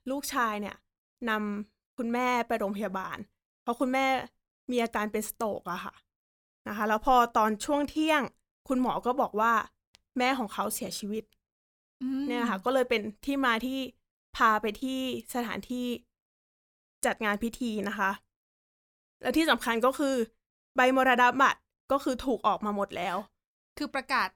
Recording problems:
none

